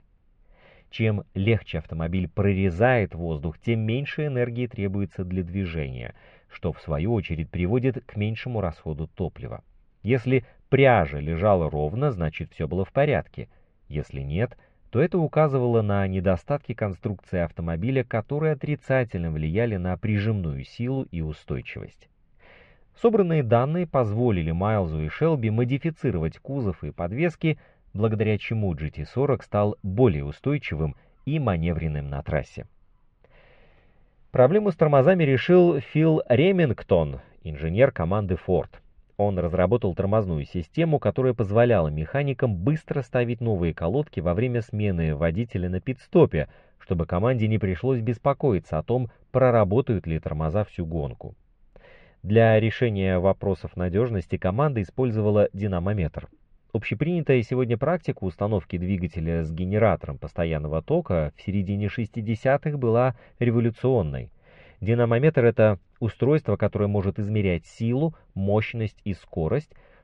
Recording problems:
muffled; very; fading above 2.5 kHz

